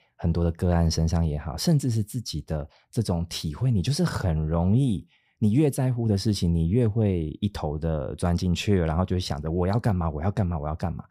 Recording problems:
none

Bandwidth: 15 kHz